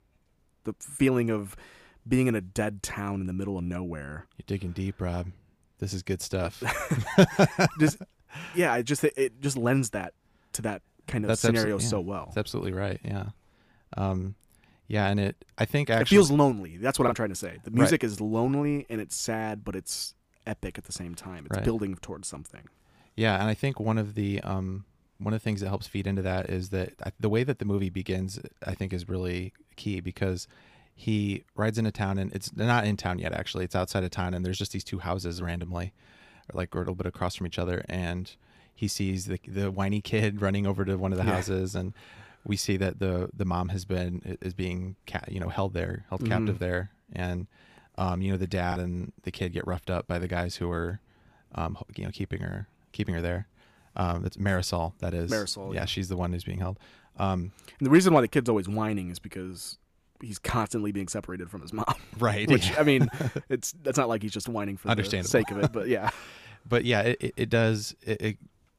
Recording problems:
choppy; occasionally; at 17 s and at 49 s; 1% of the speech affected

